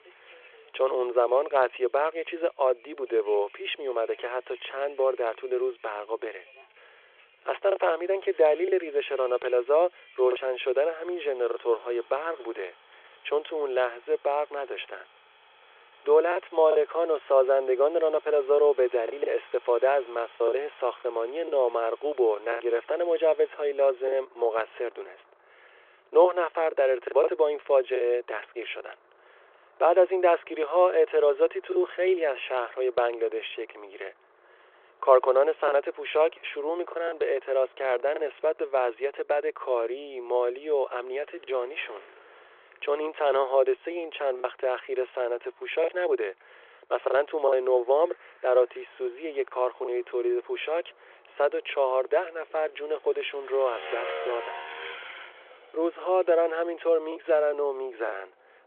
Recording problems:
phone-call audio; nothing above 3.5 kHz
traffic noise; faint; throughout; 20 dB below the speech
choppy; occasionally; 3% of the speech affected

